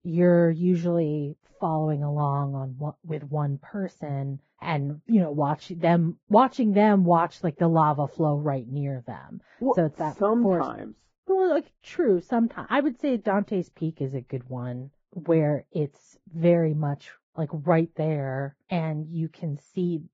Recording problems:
garbled, watery; badly
muffled; very; fading above 2 kHz

